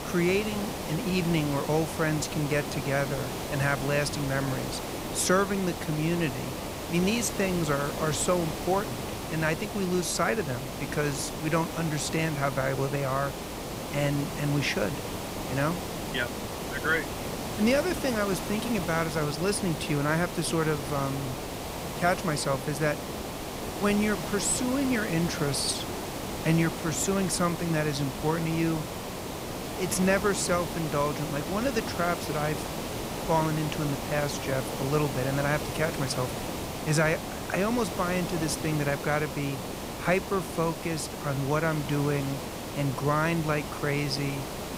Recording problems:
hiss; loud; throughout; 6 dB below the speech

